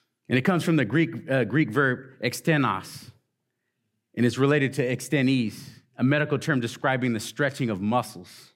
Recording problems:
none

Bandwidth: 16 kHz